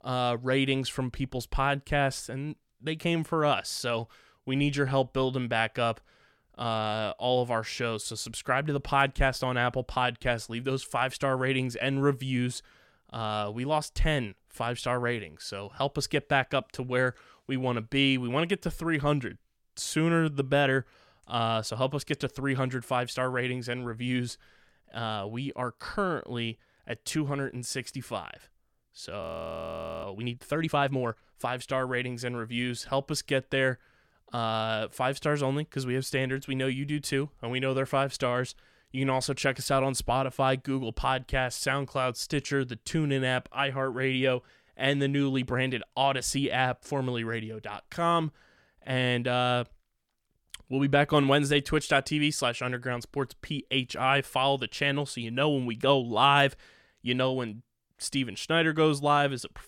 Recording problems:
audio freezing; at 29 s for 1 s

